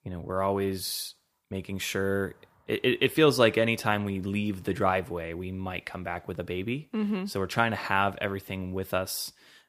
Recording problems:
none

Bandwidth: 15 kHz